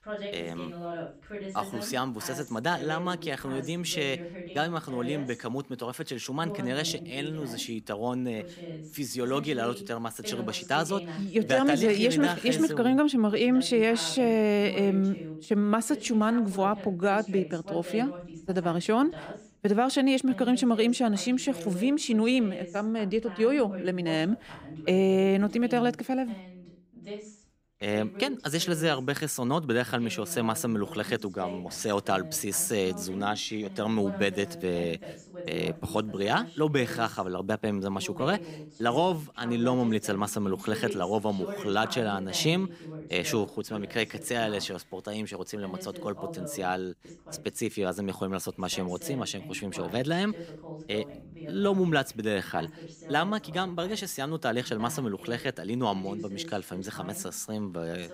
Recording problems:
voice in the background; noticeable; throughout; 15 dB below the speech

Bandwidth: 15.5 kHz